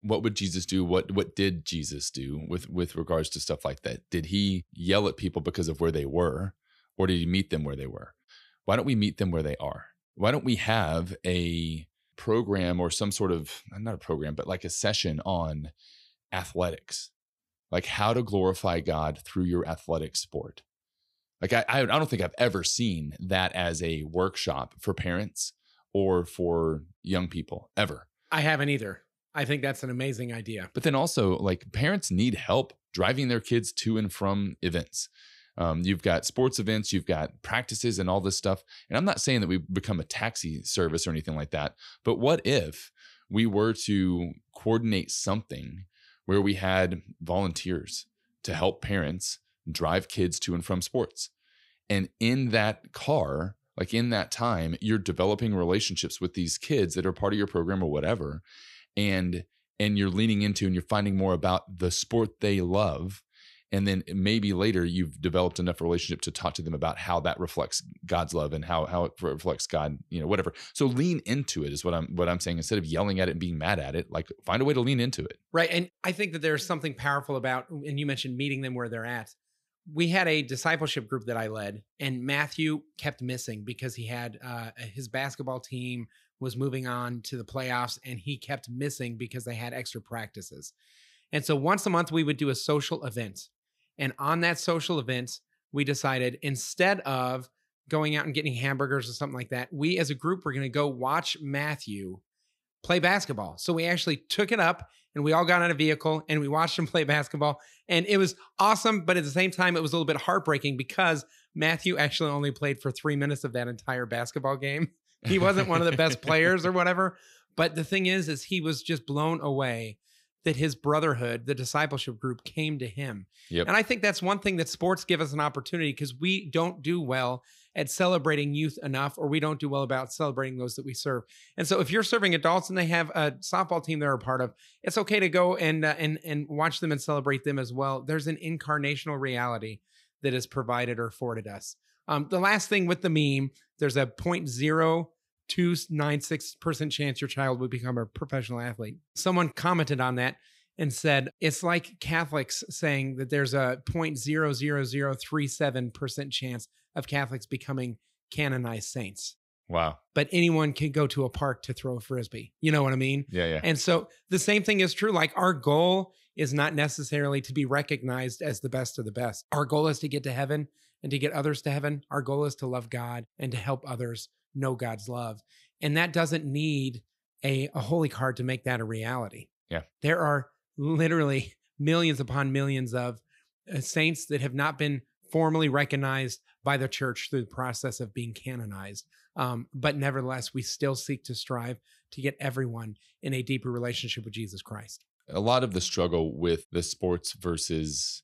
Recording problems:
none

